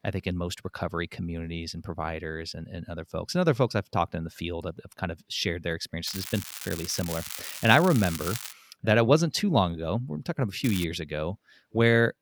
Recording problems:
crackling; loud; from 6 to 8.5 s and at 11 s; 9 dB below the speech

